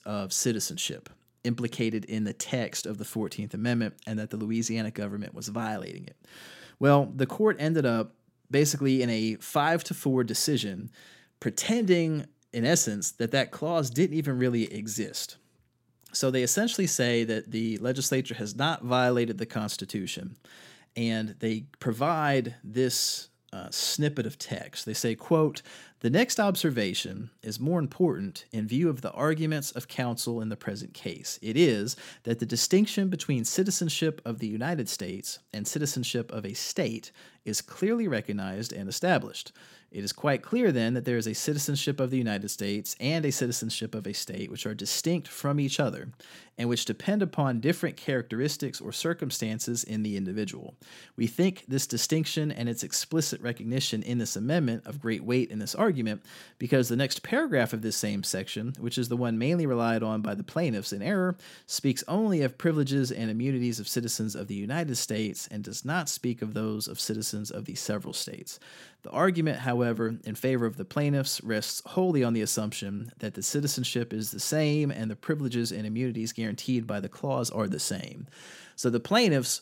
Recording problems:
none

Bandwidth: 16 kHz